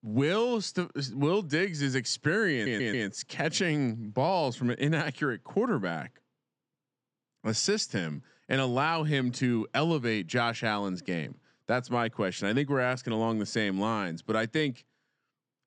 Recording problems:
audio stuttering; at 2.5 s

